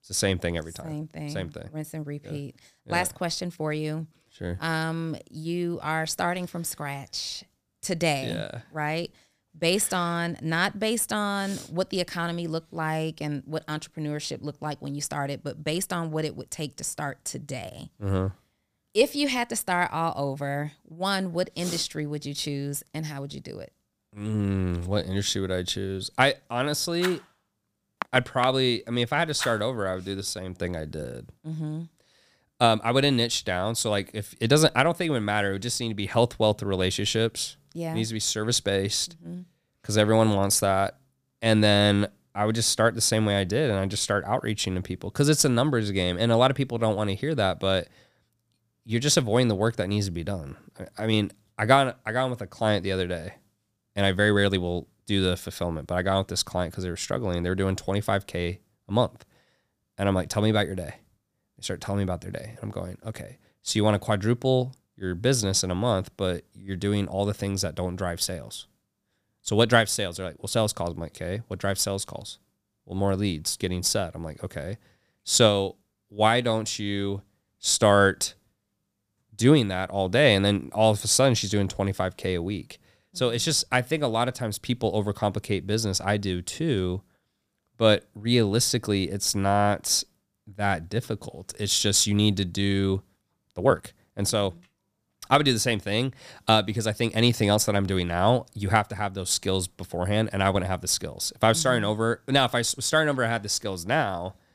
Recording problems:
uneven, jittery; strongly; from 4 s to 1:34

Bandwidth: 15 kHz